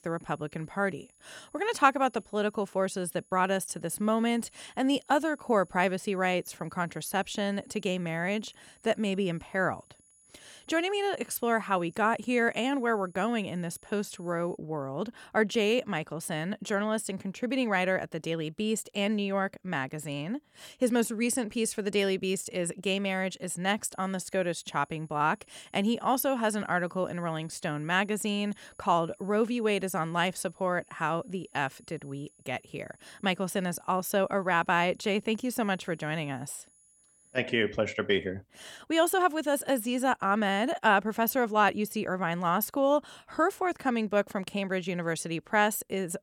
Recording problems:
high-pitched whine; faint; until 15 s and from 24 to 37 s; 10 kHz, 30 dB below the speech

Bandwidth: 17.5 kHz